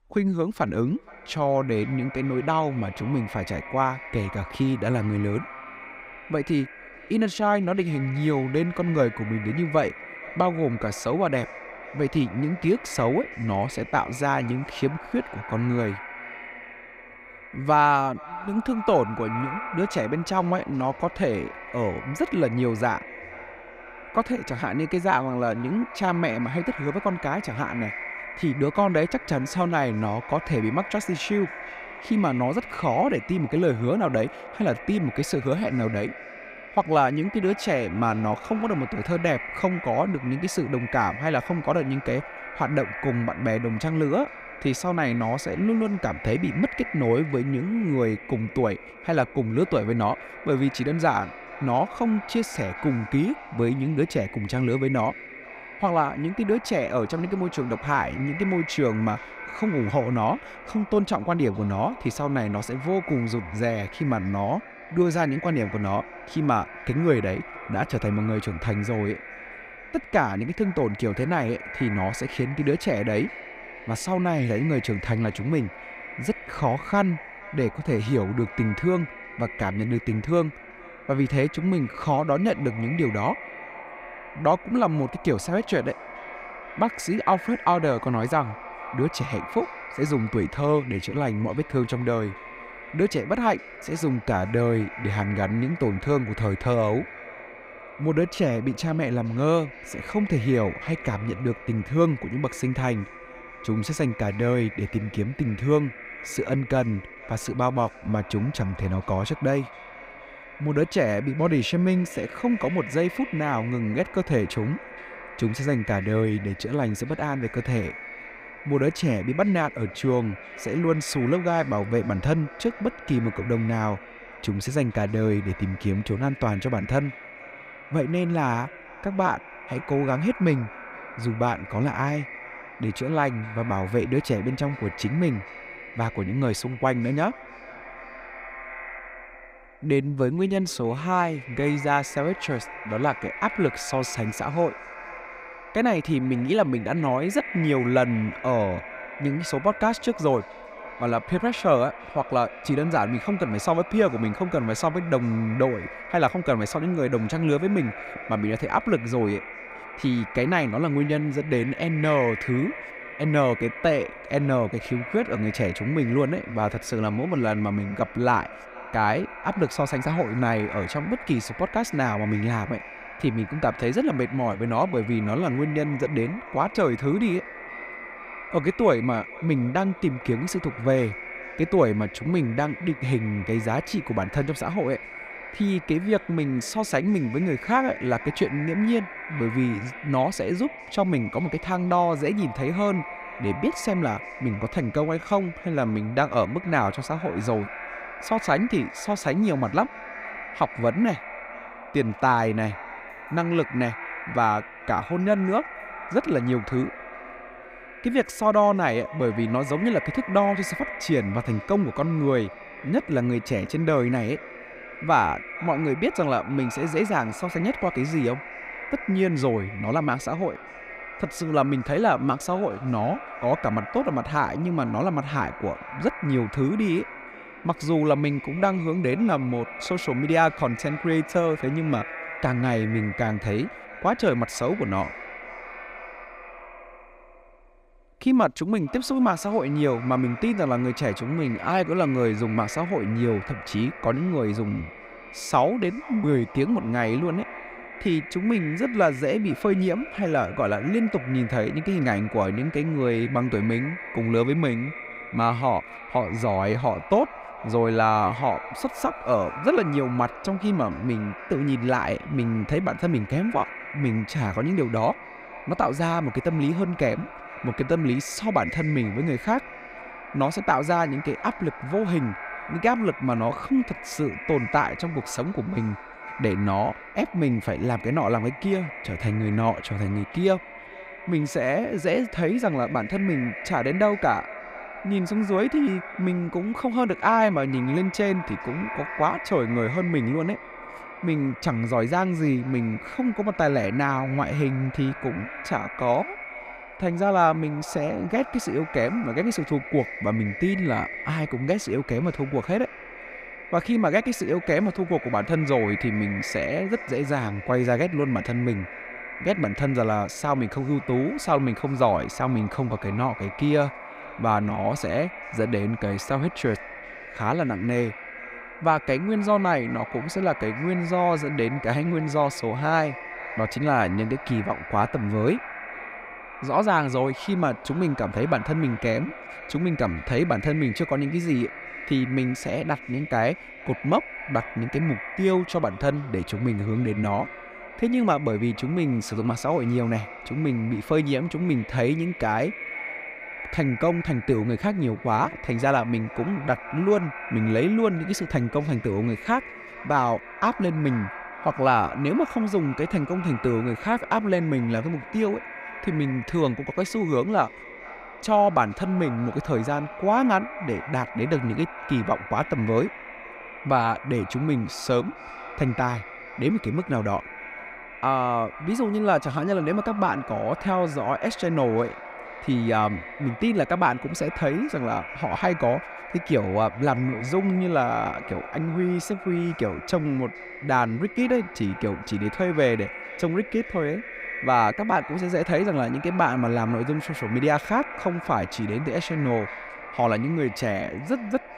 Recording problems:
echo of what is said; noticeable; throughout; 470 ms later, 10 dB below the speech

